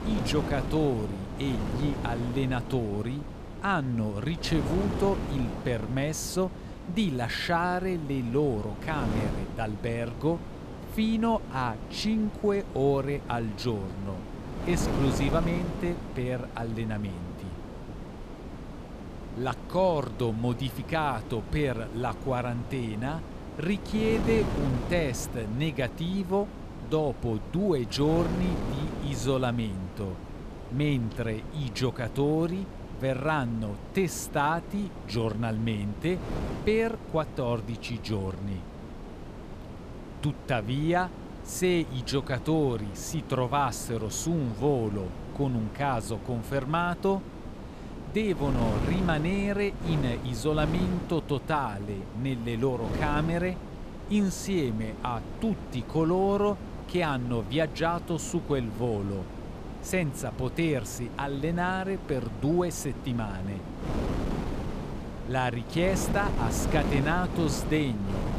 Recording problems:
wind noise on the microphone; heavy; 10 dB below the speech

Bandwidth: 14.5 kHz